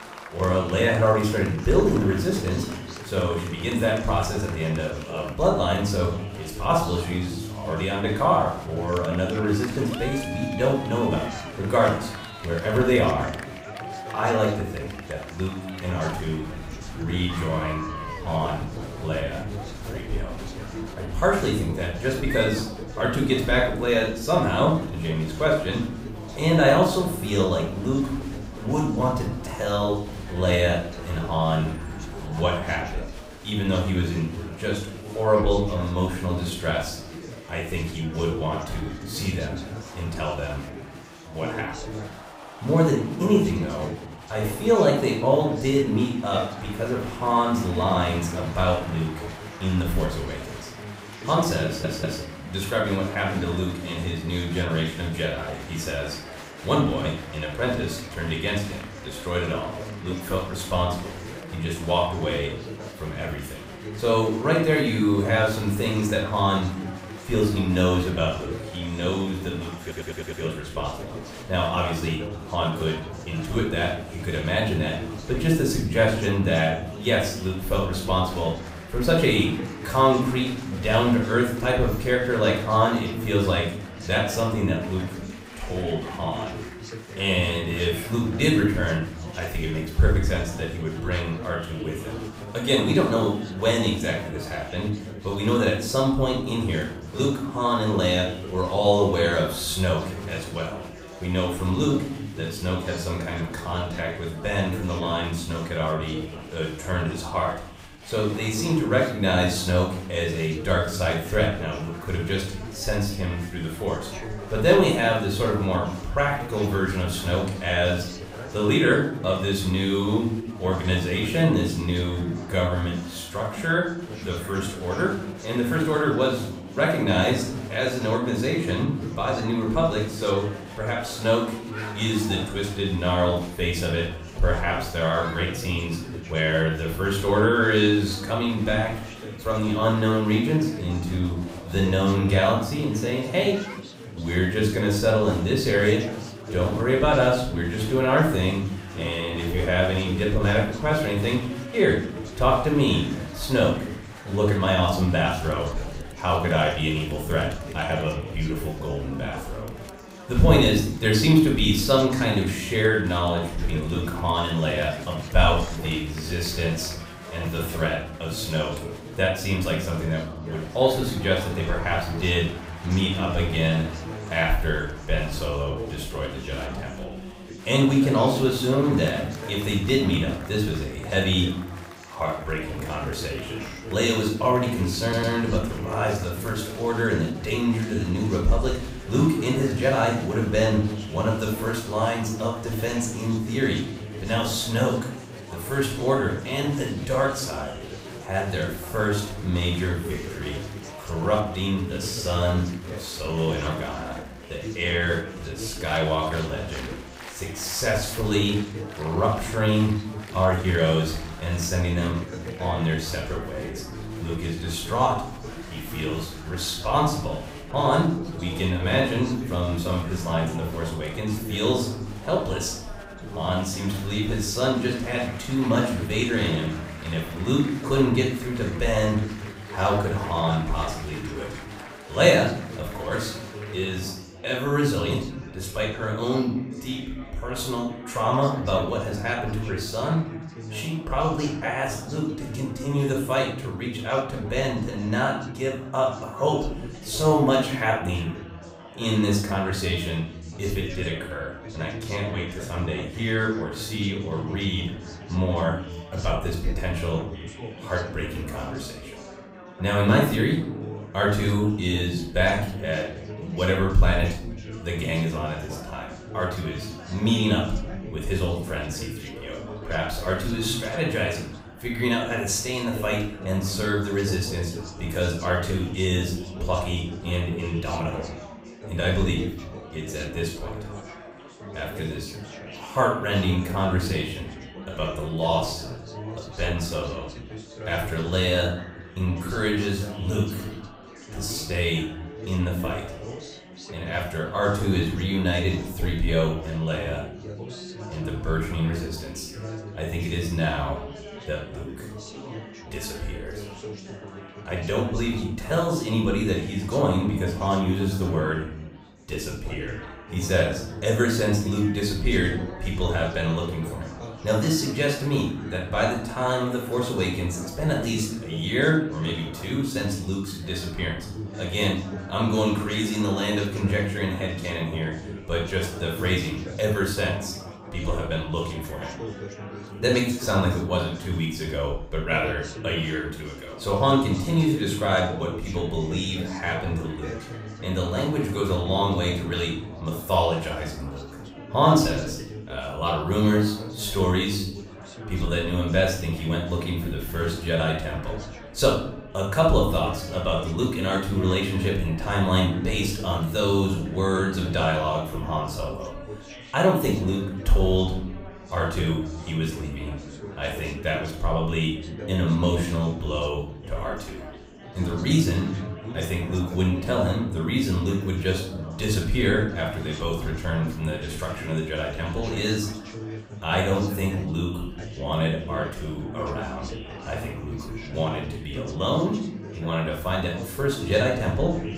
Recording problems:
off-mic speech; far
room echo; noticeable; dies away in 0.6 s
chatter from many people; noticeable; throughout; 15 dB below the speech
audio stuttering; at 52 s, at 1:10 and at 3:05

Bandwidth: 15.5 kHz